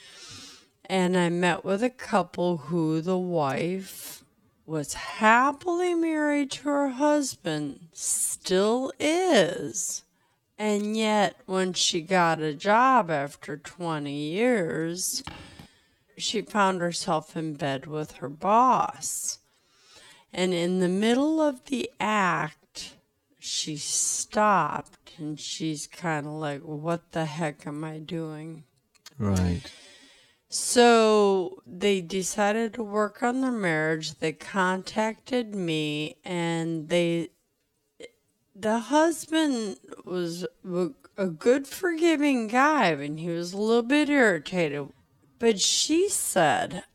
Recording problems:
wrong speed, natural pitch; too slow; 0.5 times normal speed
footsteps; faint; at 15 s; peak 15 dB below the speech

